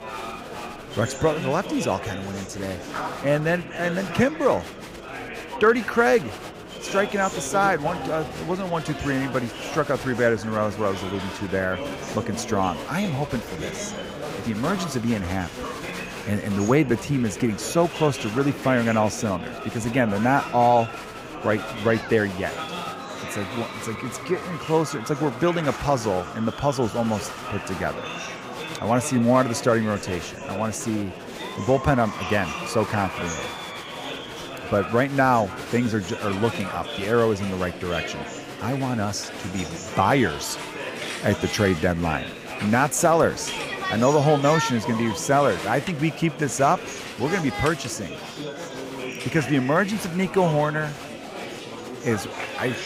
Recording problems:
murmuring crowd; loud; throughout; 9 dB below the speech

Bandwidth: 15.5 kHz